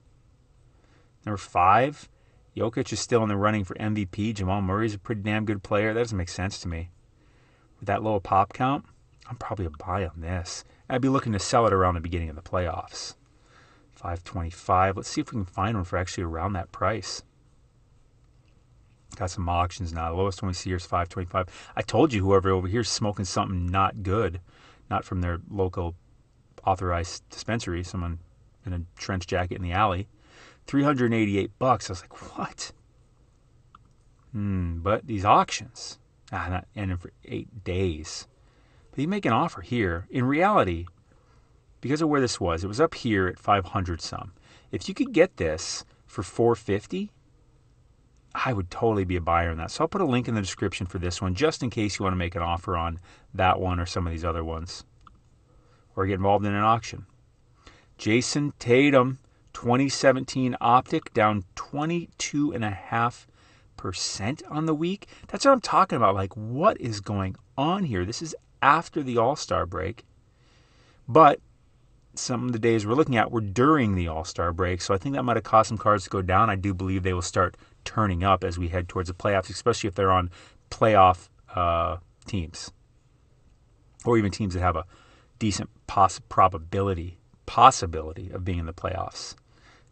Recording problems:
garbled, watery; slightly; nothing above 8.5 kHz

